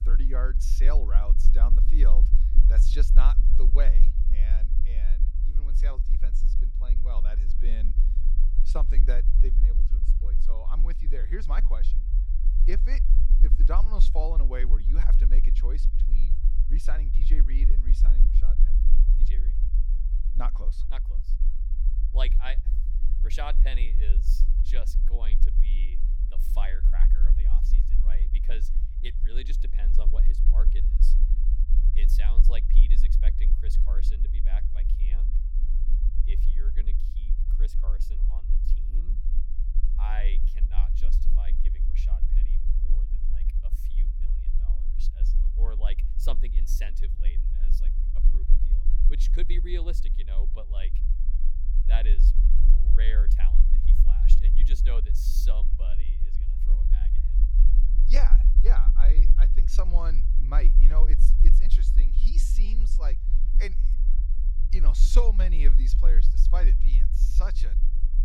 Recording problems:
low rumble; loud; throughout; 9 dB below the speech

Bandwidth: 18.5 kHz